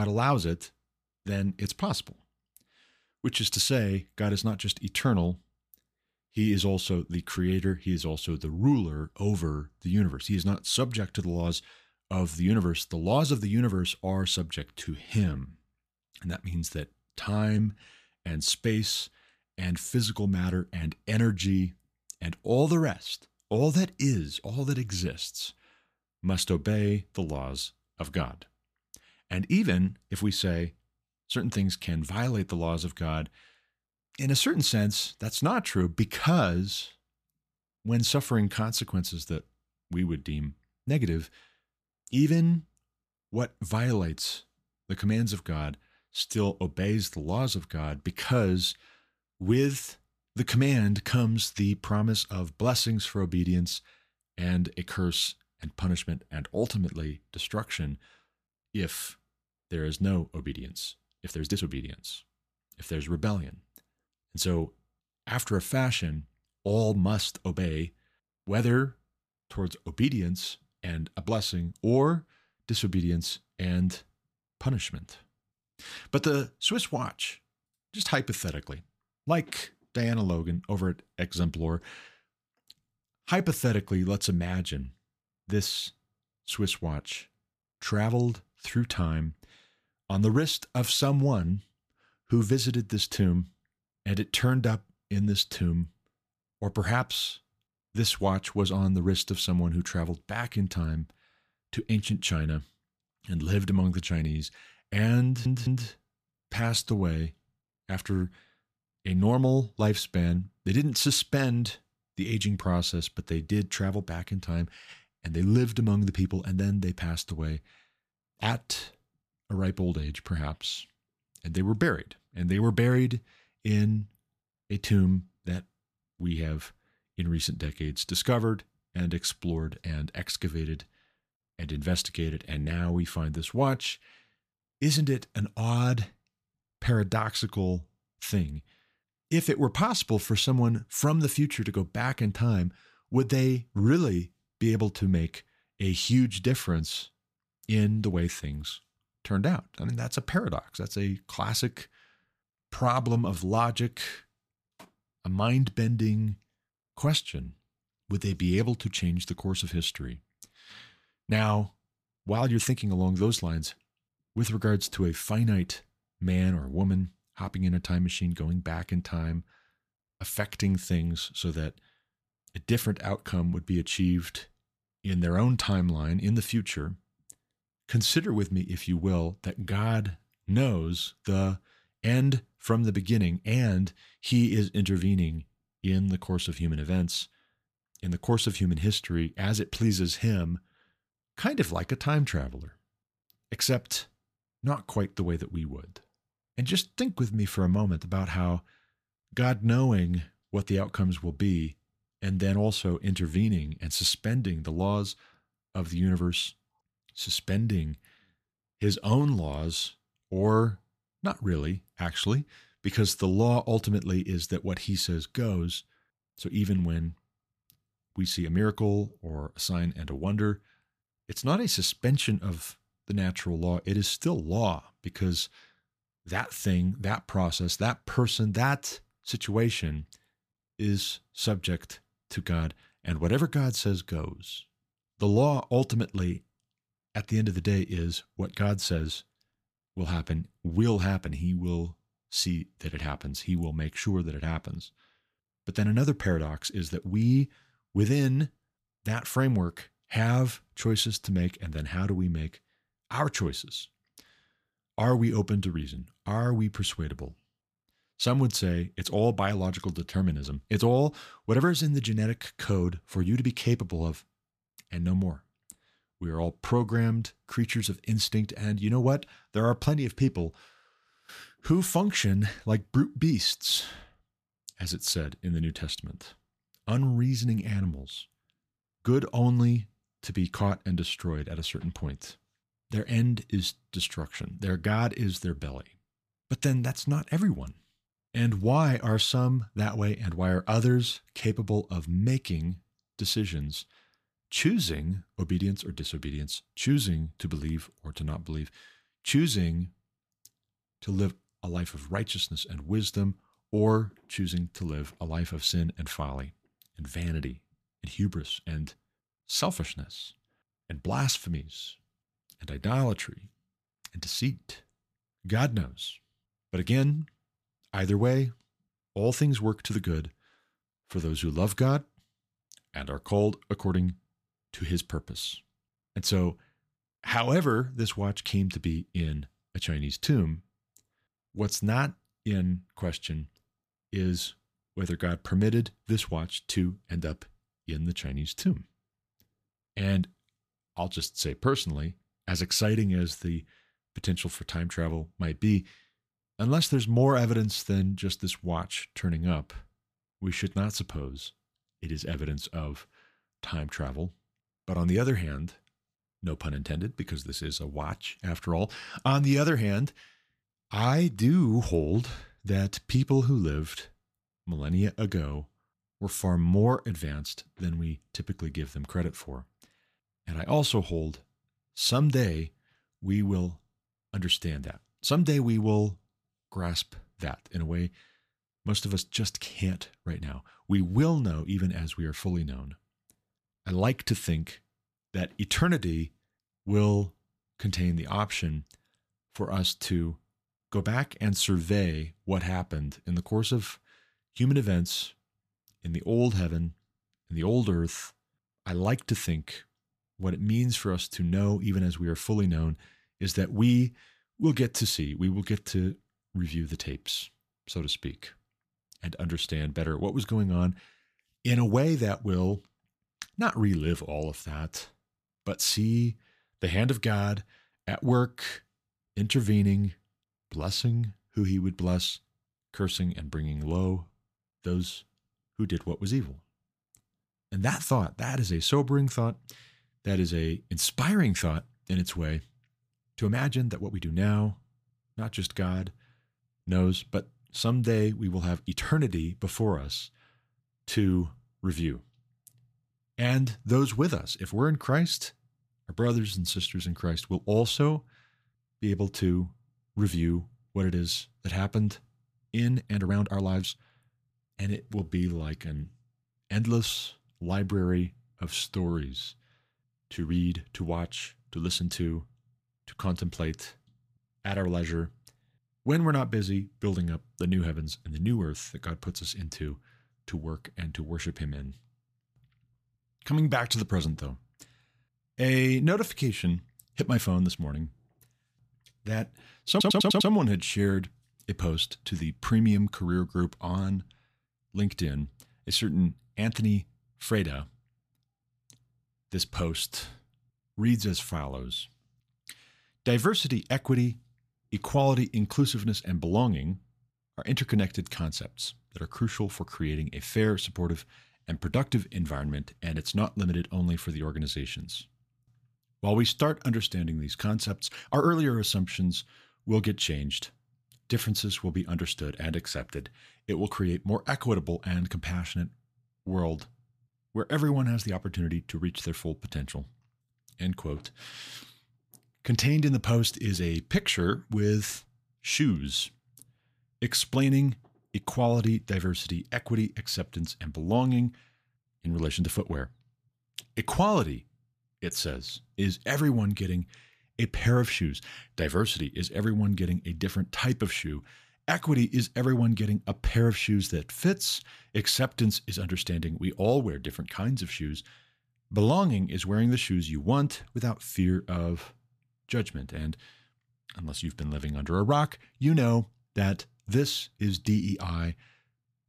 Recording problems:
abrupt cut into speech; at the start
uneven, jittery; strongly; from 15 s to 8:29
audio stuttering; at 1:45 and at 8:00

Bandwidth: 14.5 kHz